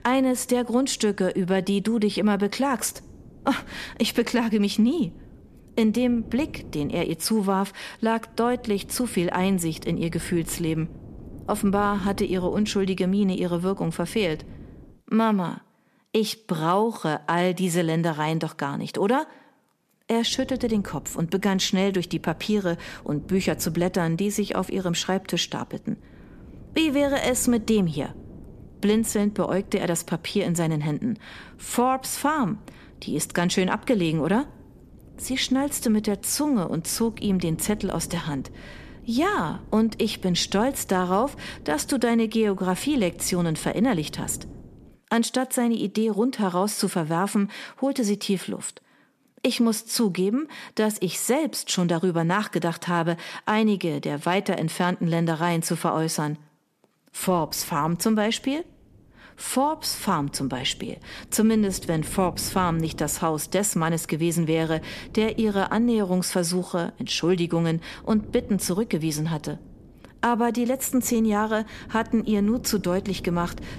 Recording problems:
wind noise on the microphone; occasional gusts; until 15 s, from 20 to 45 s and from 57 s on; 25 dB below the speech

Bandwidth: 14.5 kHz